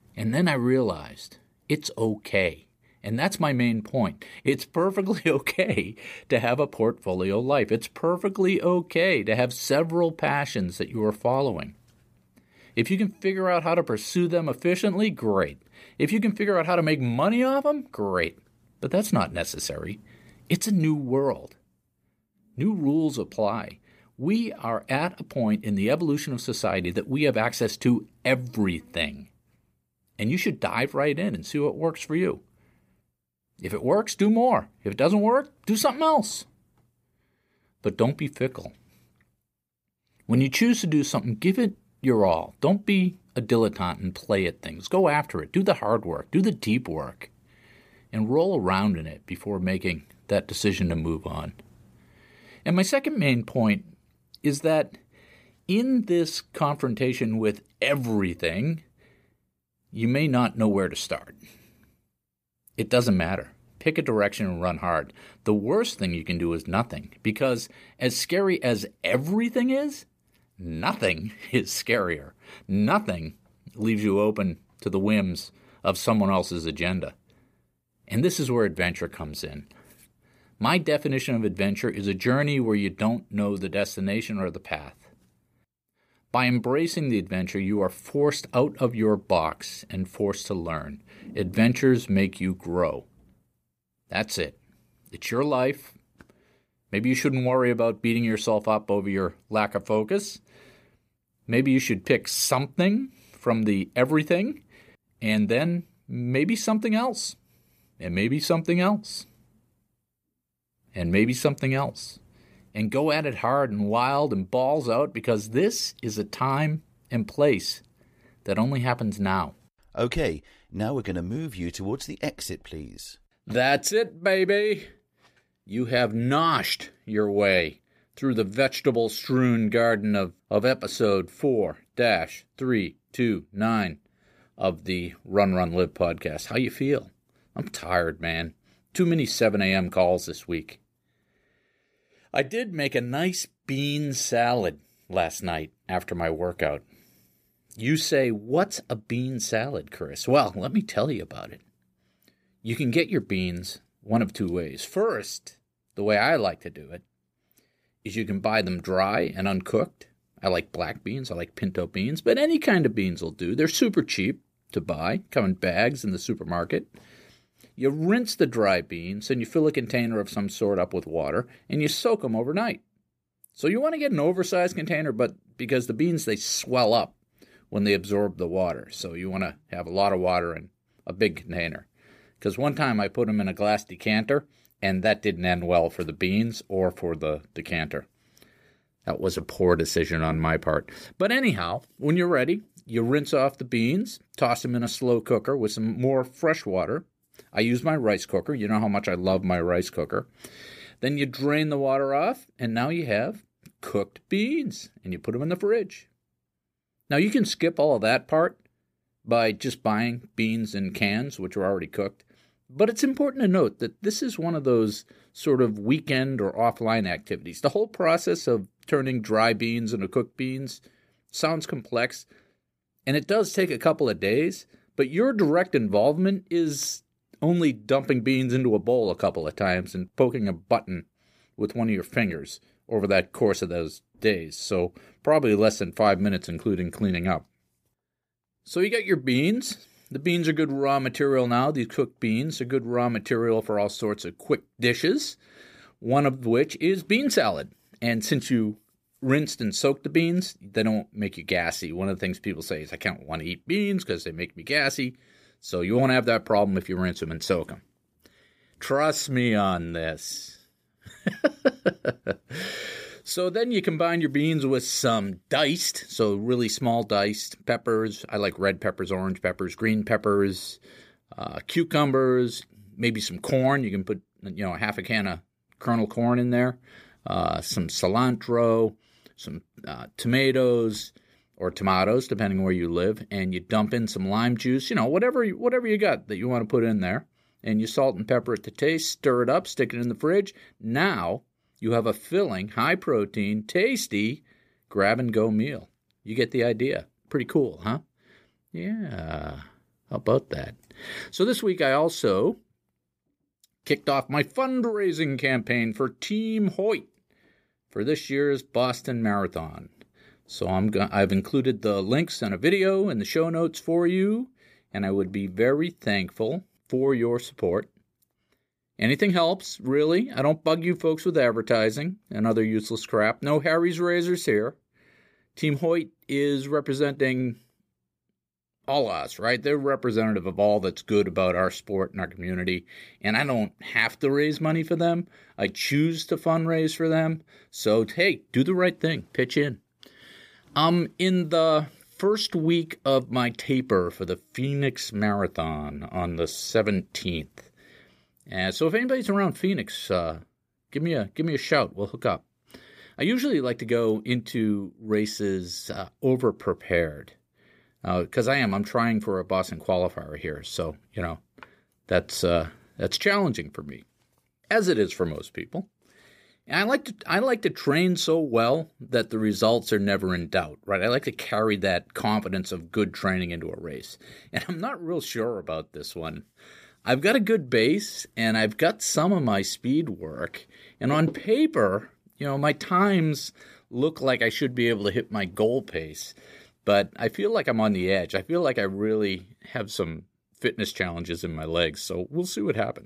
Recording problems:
none

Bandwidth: 15 kHz